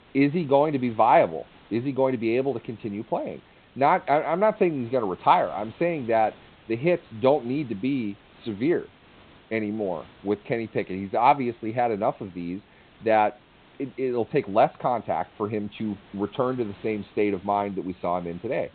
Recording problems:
high frequencies cut off; severe; nothing above 4 kHz
hiss; faint; throughout; 25 dB below the speech

